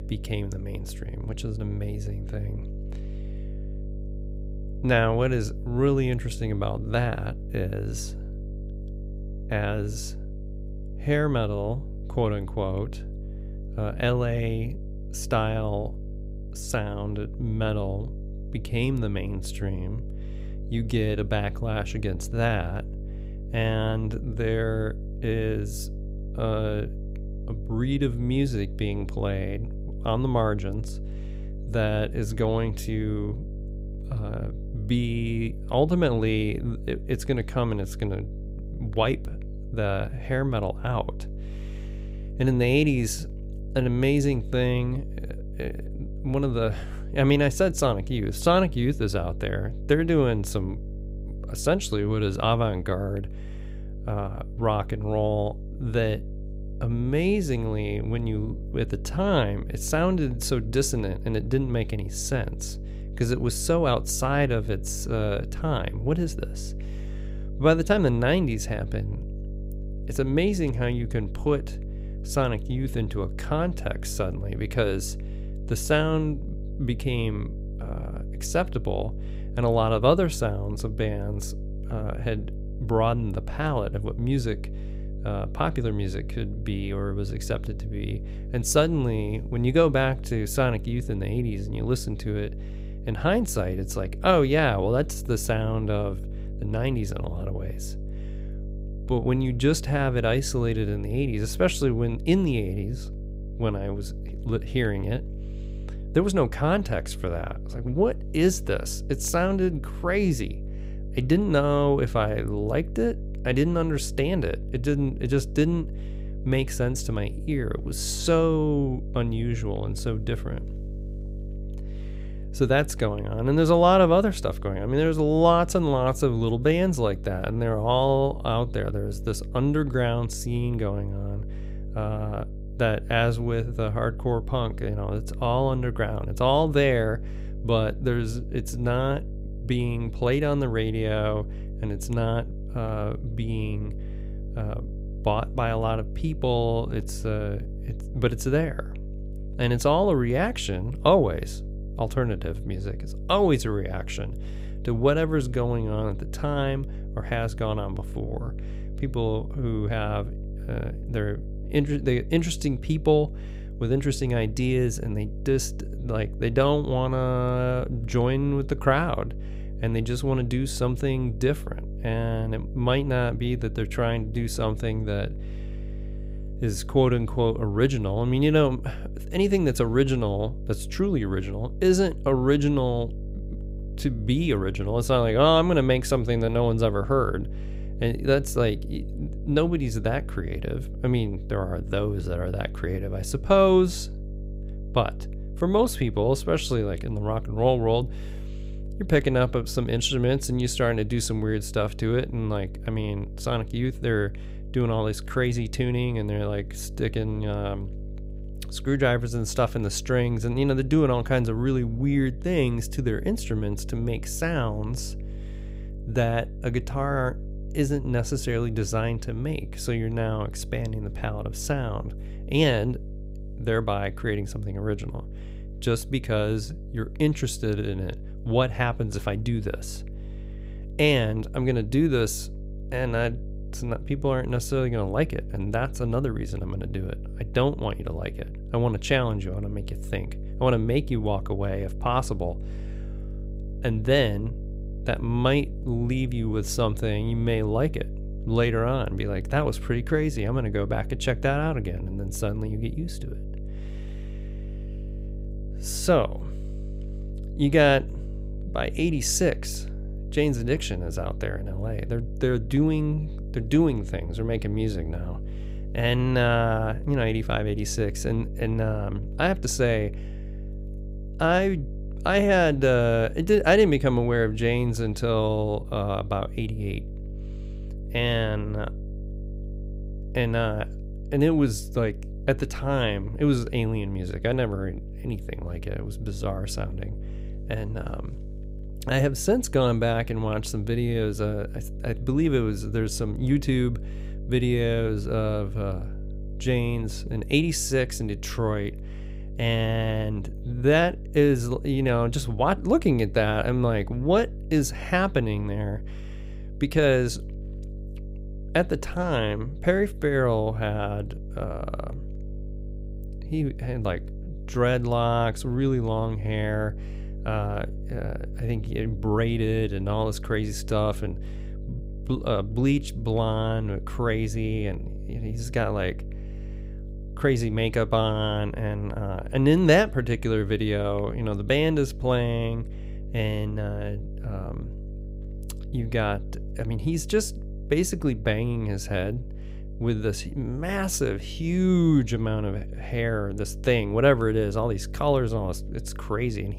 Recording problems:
electrical hum; faint; throughout; 50 Hz, 20 dB below the speech

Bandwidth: 15.5 kHz